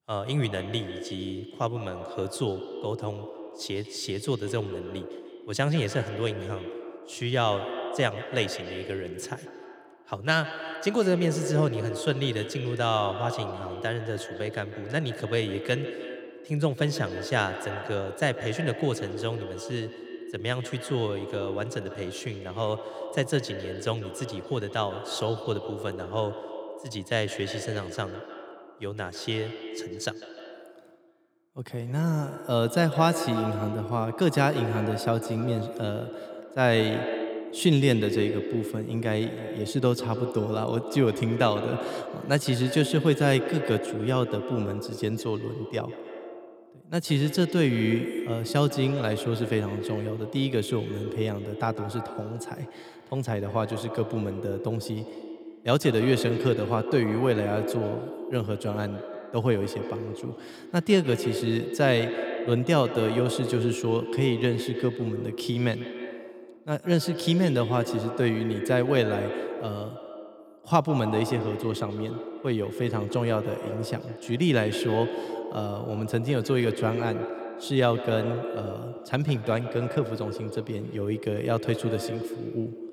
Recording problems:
echo of what is said; strong; throughout; 150 ms later, 7 dB below the speech

